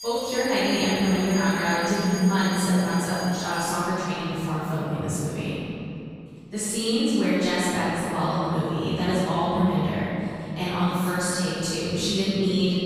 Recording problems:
room echo; strong; dies away in 2.7 s
off-mic speech; far
alarms or sirens; very faint; throughout; 10 dB below the speech

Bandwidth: 15 kHz